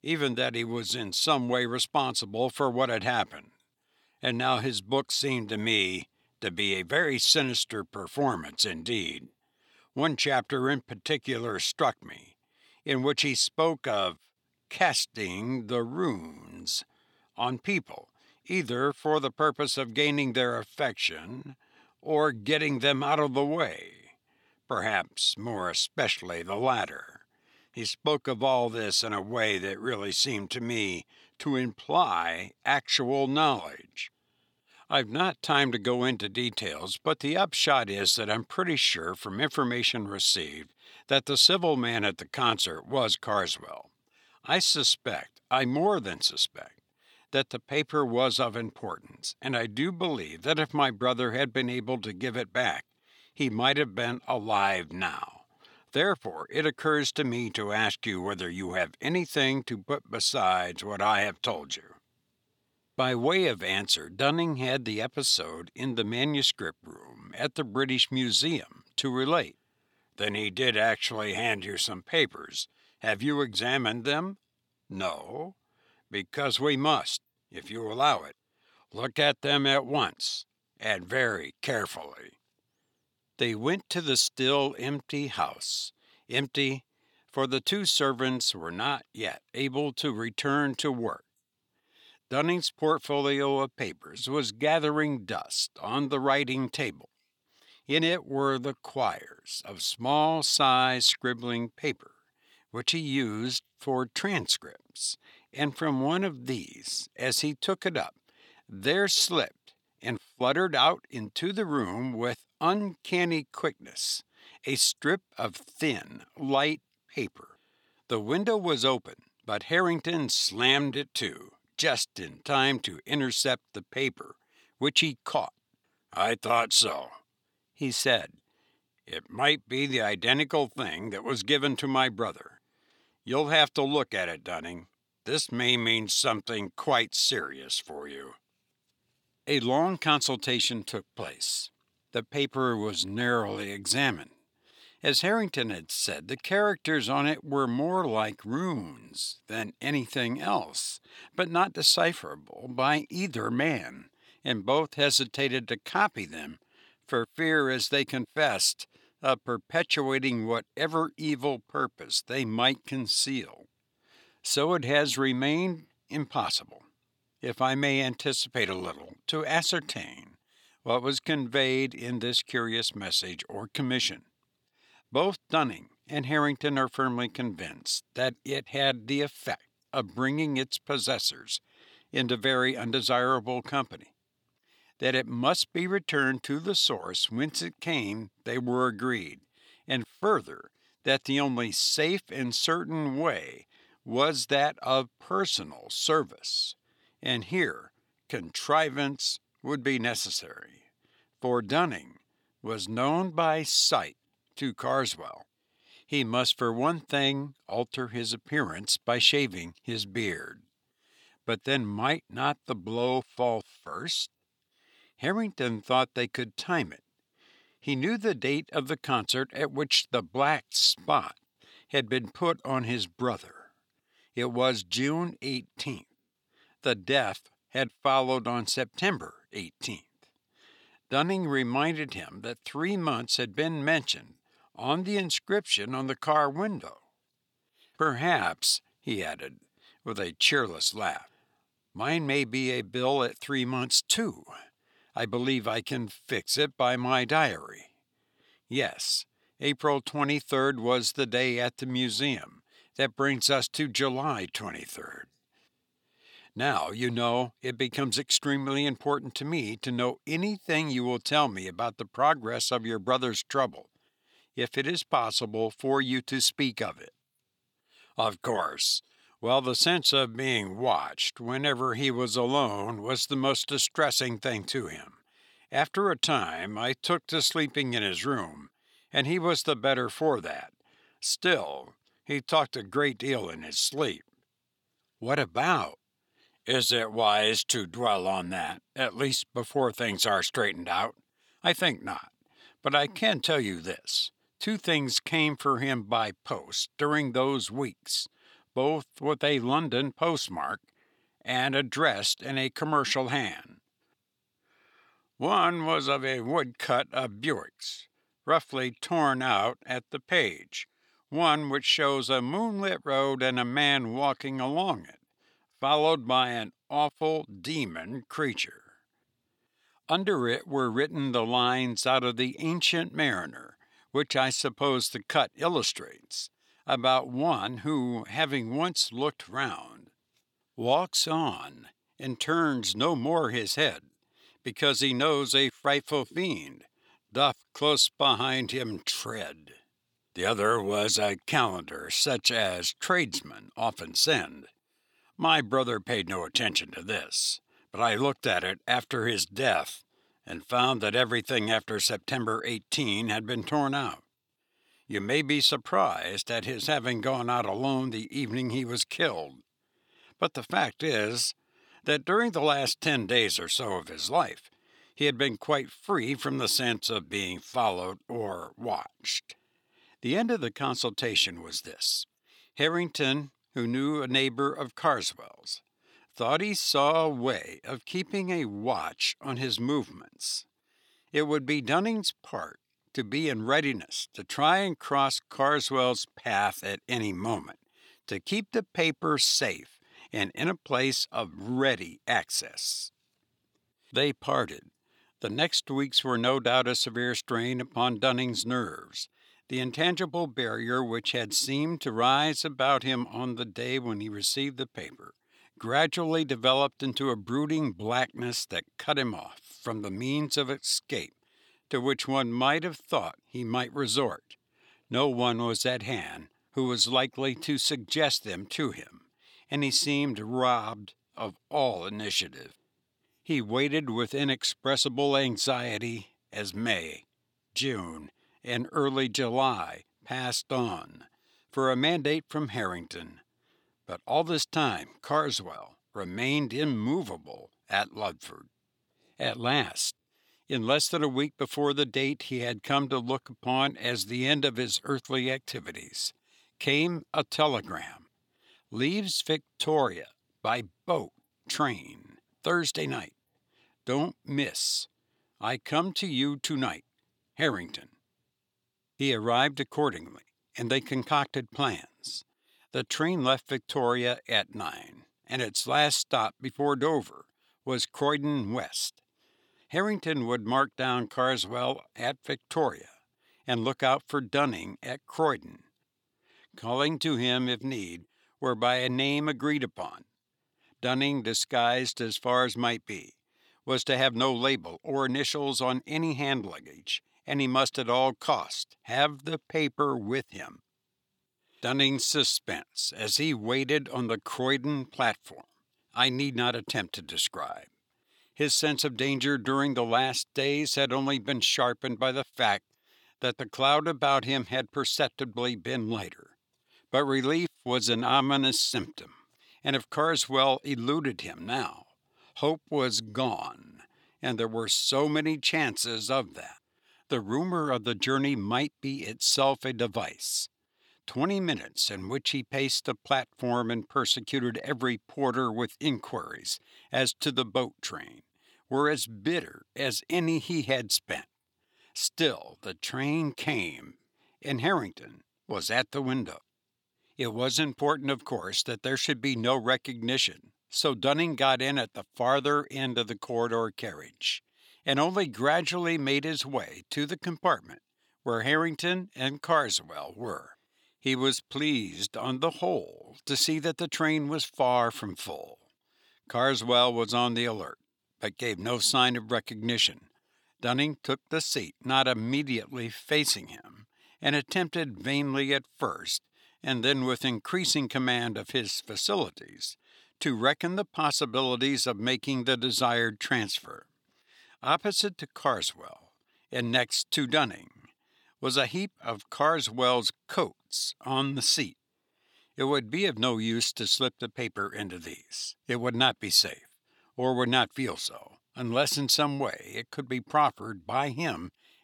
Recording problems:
thin; somewhat; fading below 1 kHz

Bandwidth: 18.5 kHz